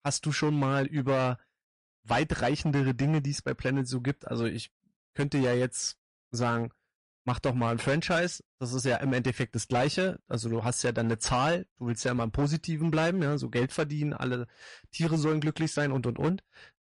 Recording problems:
distortion; slight; 10% of the sound clipped
garbled, watery; slightly; nothing above 10.5 kHz

